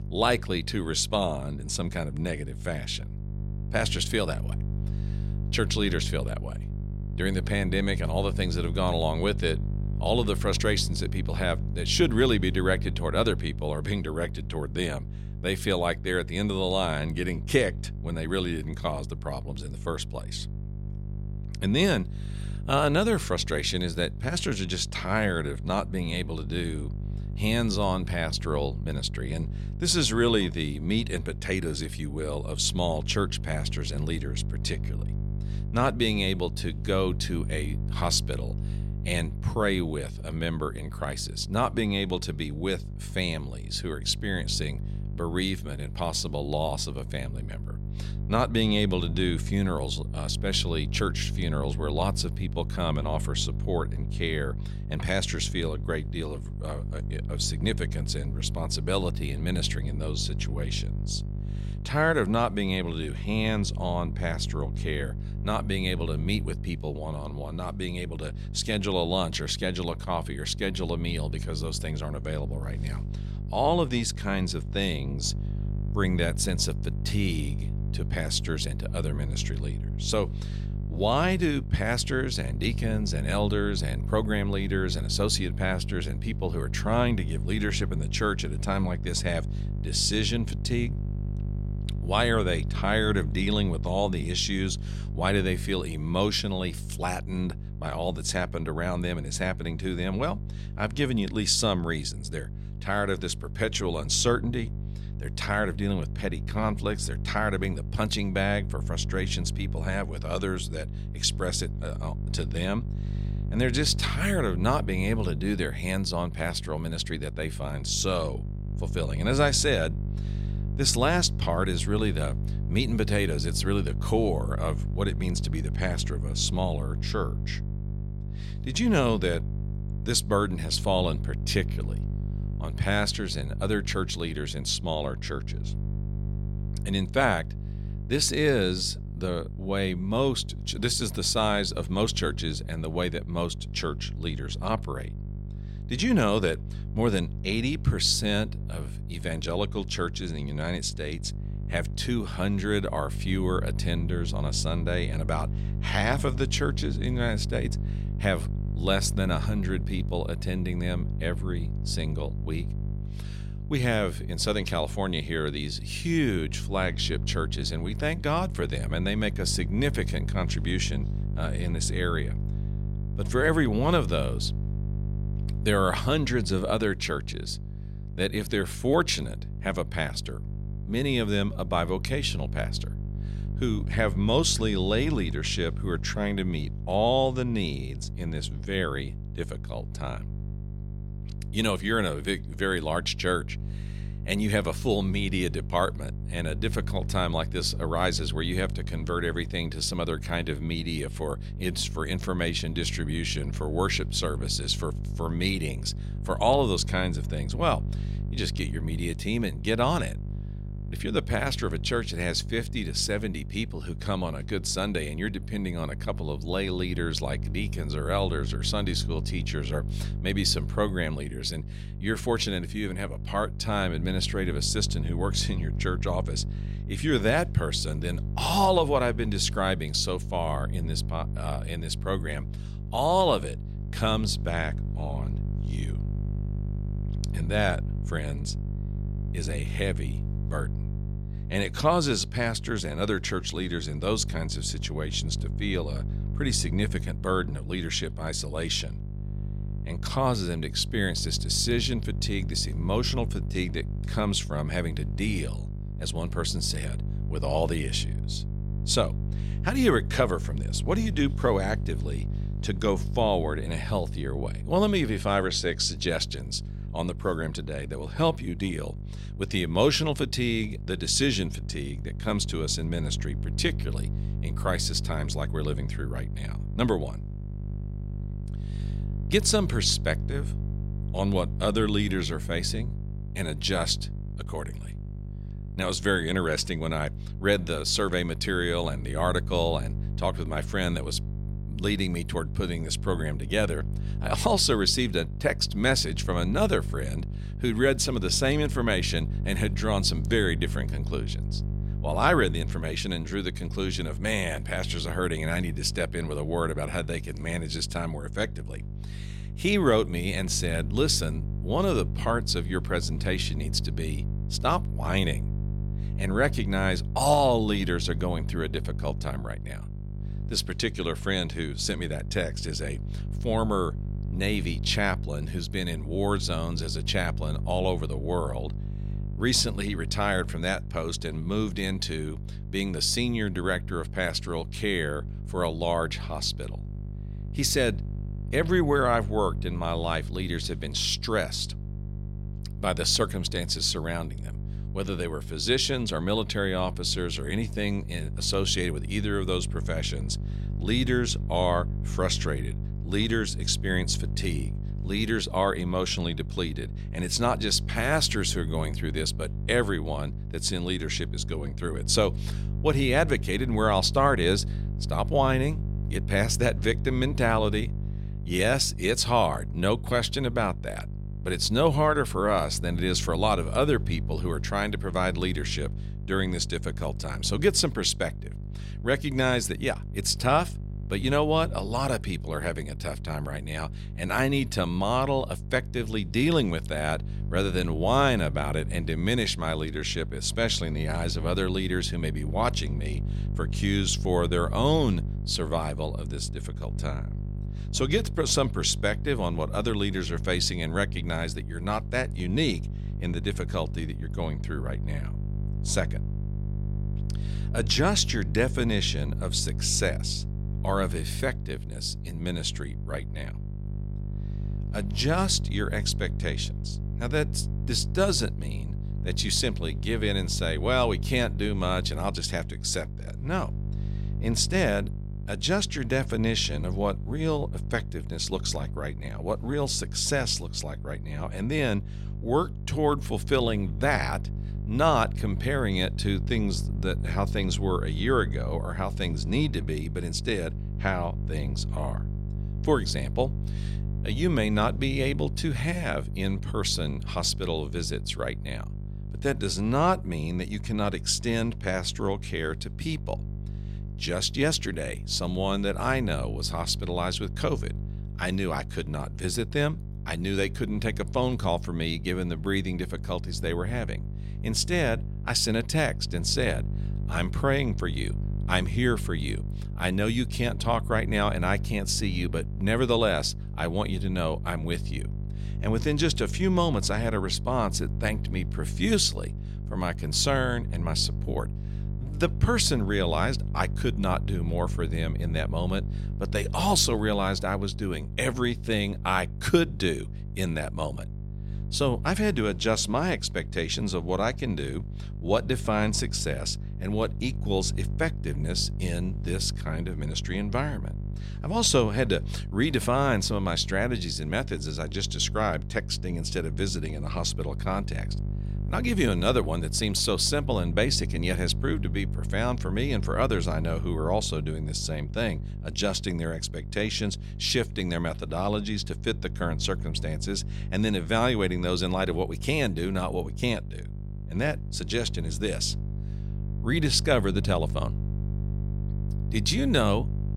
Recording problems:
electrical hum; noticeable; throughout; 50 Hz, 15 dB below the speech

